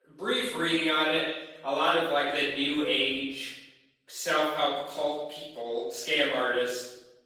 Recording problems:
off-mic speech; far
room echo; noticeable; dies away in 0.9 s
thin; somewhat; fading below 300 Hz
garbled, watery; slightly; nothing above 18.5 kHz

